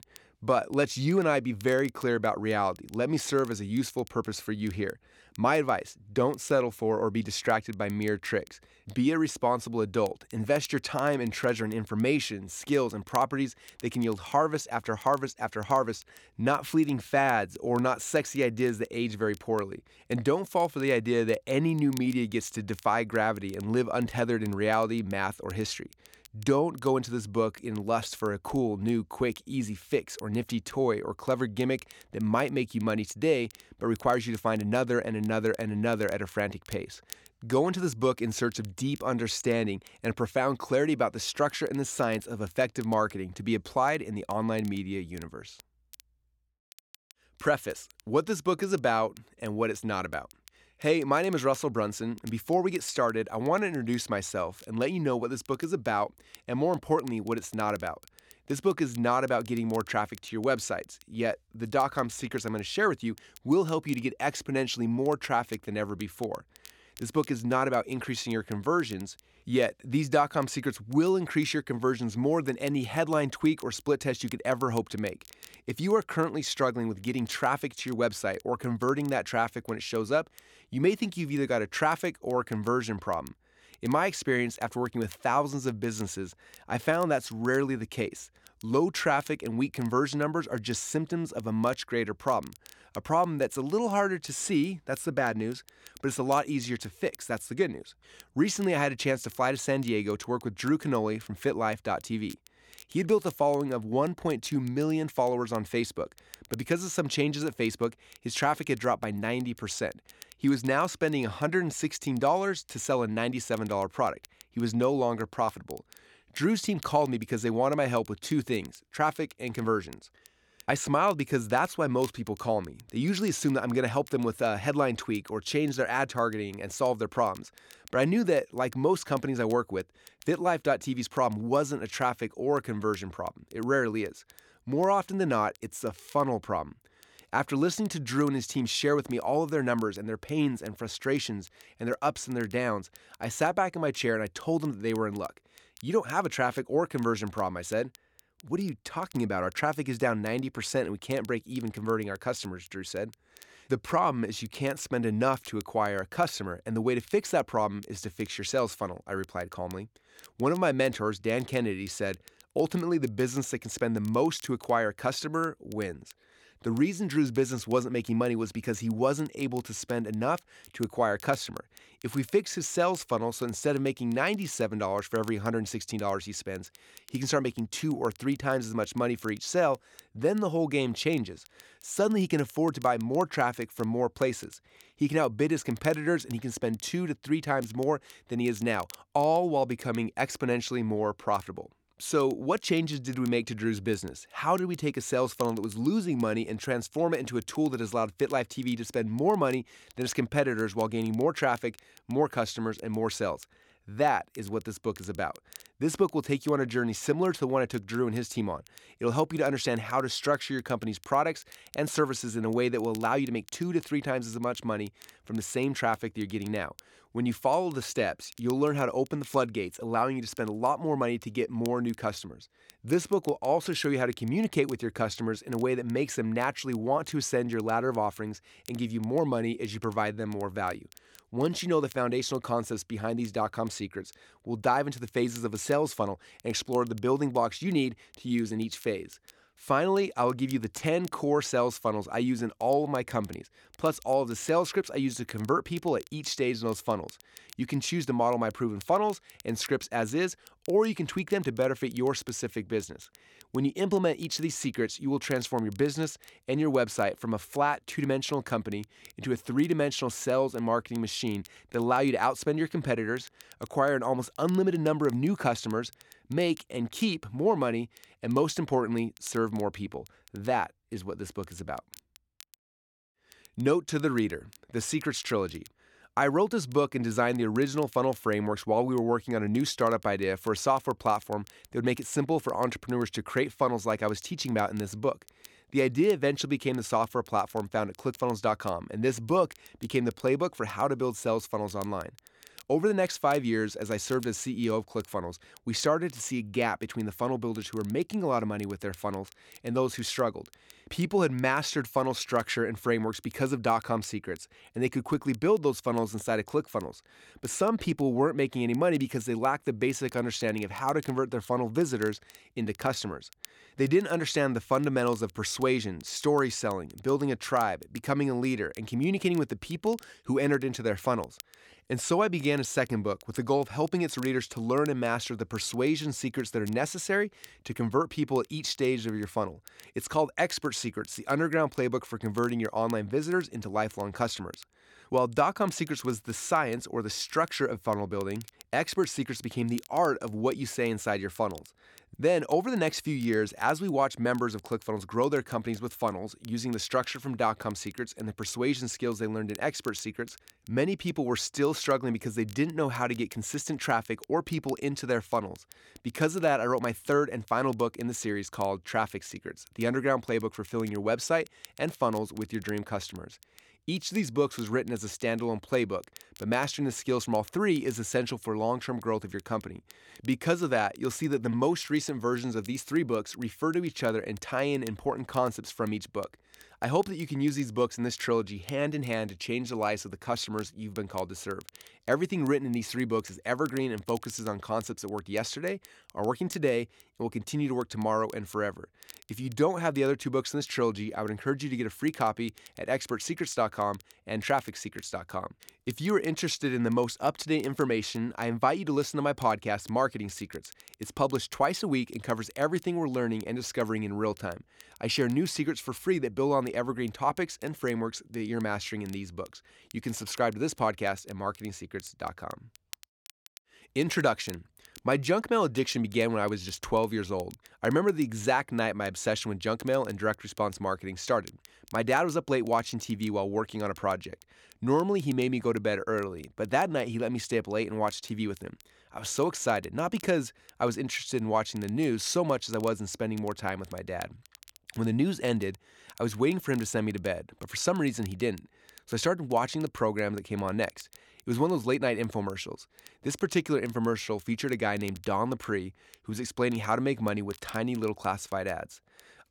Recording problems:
crackle, like an old record; faint; 25 dB below the speech

